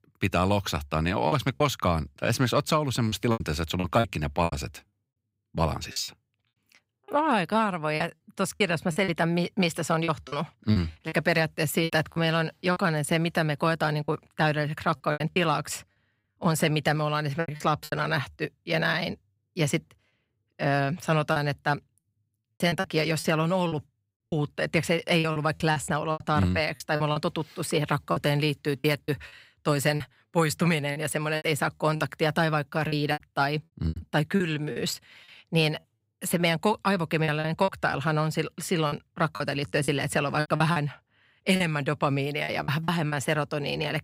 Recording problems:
choppy; very; 9% of the speech affected

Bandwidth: 15.5 kHz